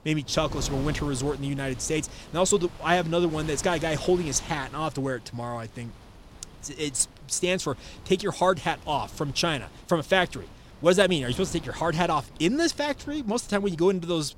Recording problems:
wind noise on the microphone; occasional gusts; 20 dB below the speech

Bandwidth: 16 kHz